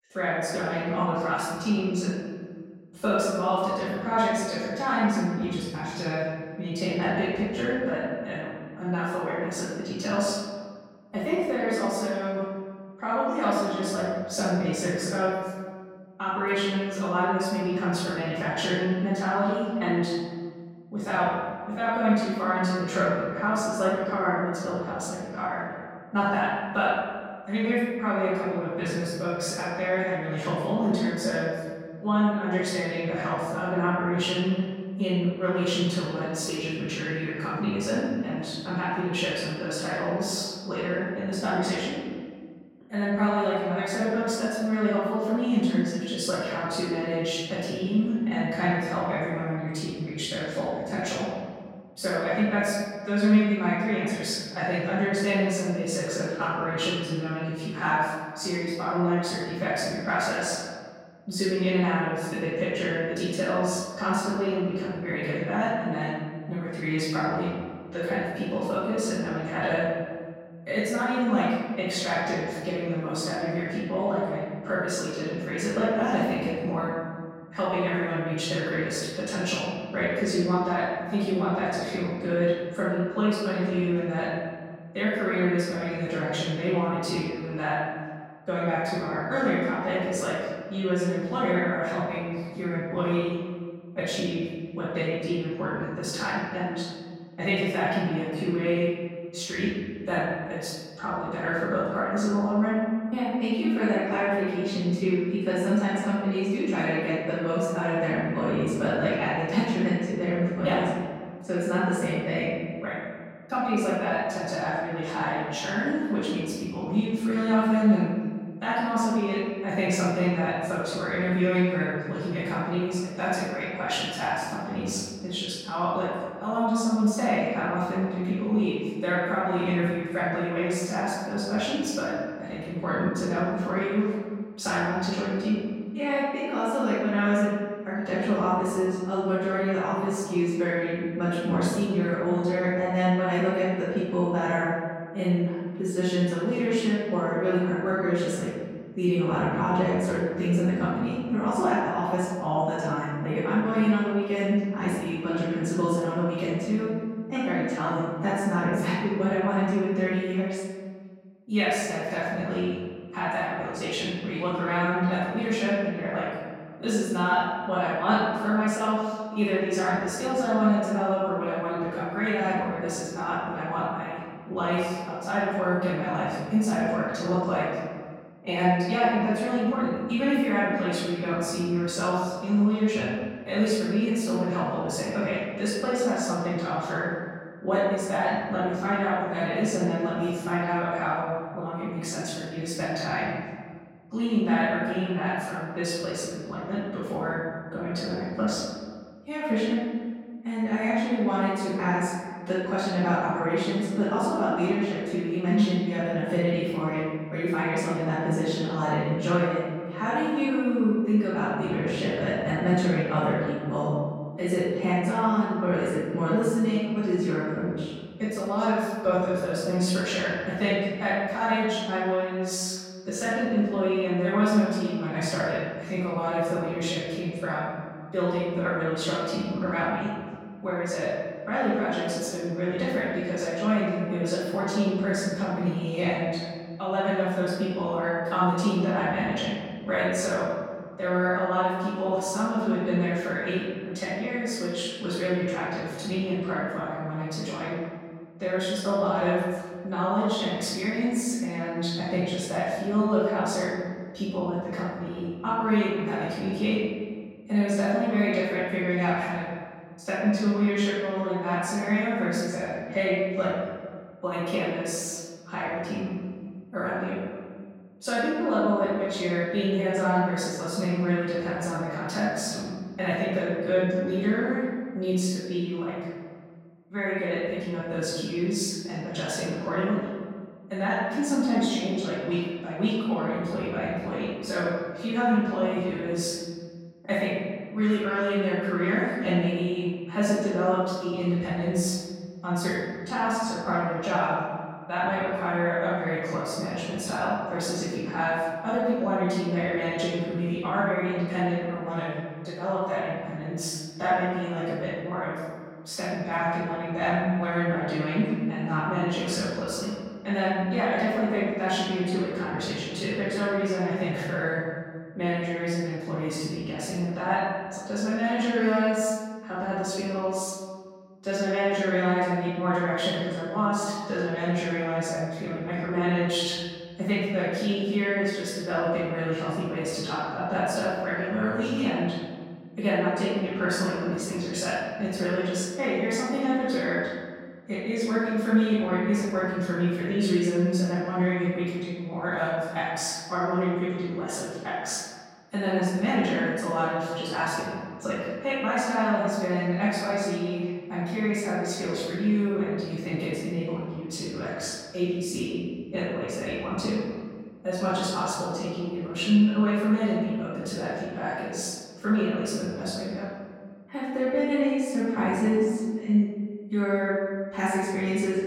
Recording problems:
room echo; strong; dies away in 1.7 s
off-mic speech; far

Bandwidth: 17 kHz